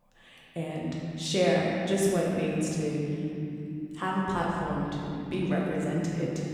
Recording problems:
off-mic speech; far
room echo; noticeable; dies away in 3 s

